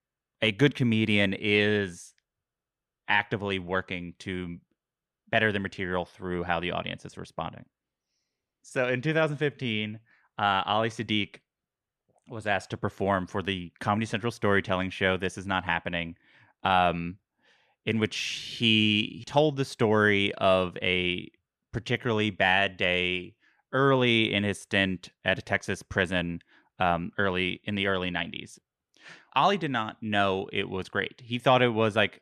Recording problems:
none

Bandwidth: 13.5 kHz